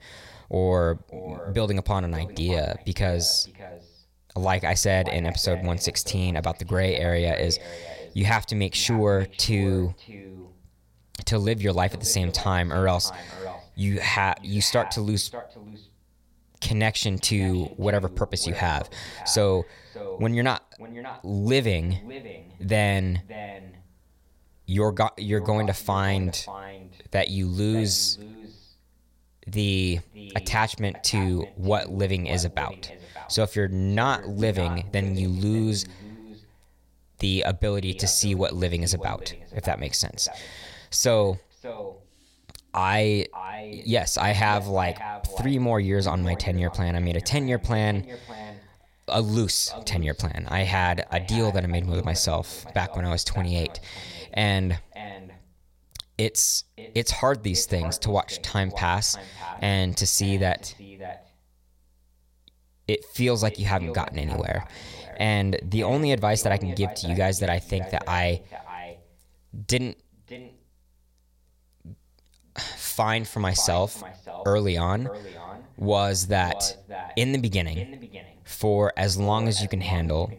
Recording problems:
echo of what is said; noticeable; throughout; 590 ms later, 15 dB below the speech

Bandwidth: 16.5 kHz